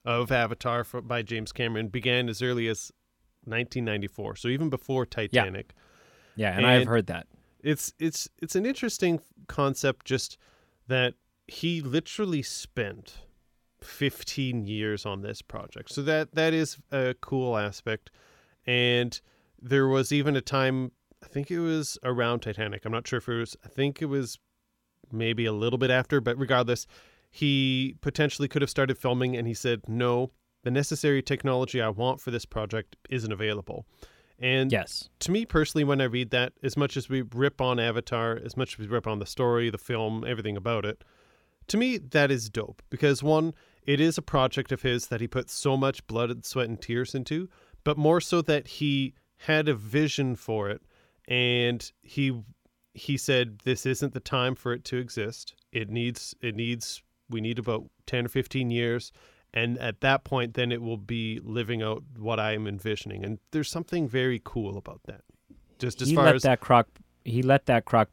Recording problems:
none

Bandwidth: 17 kHz